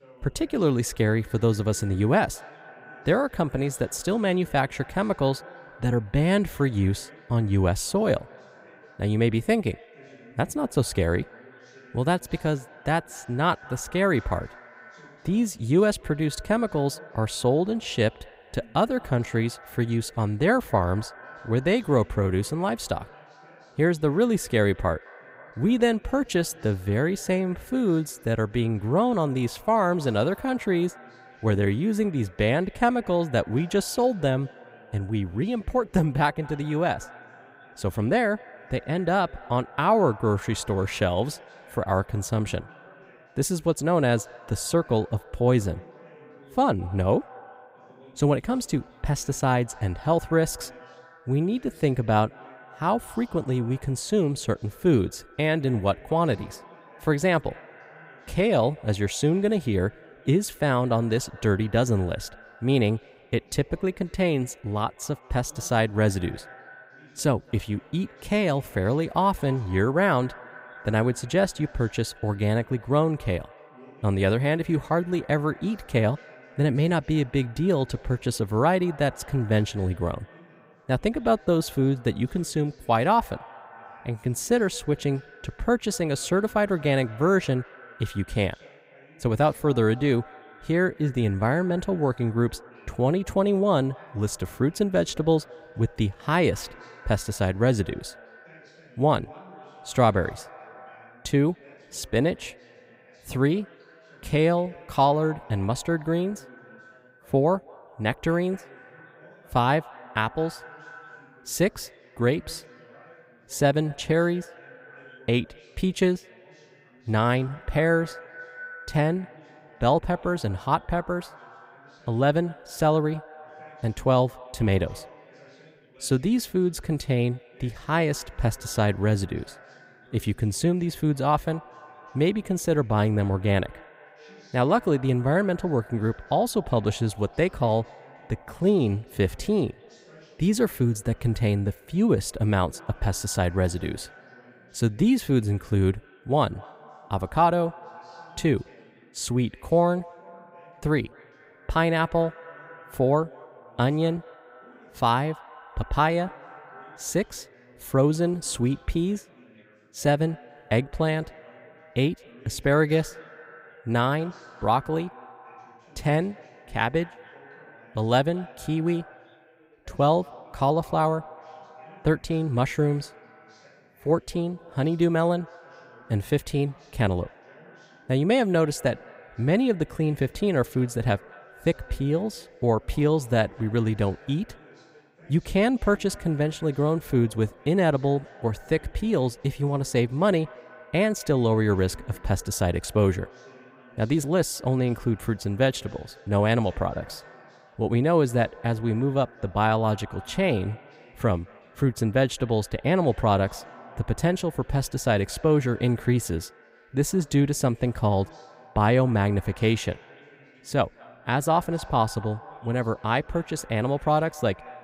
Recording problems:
echo of what is said; faint; throughout; 210 ms later, 25 dB below the speech
background chatter; faint; throughout; 2 voices, 30 dB below the speech

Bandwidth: 15.5 kHz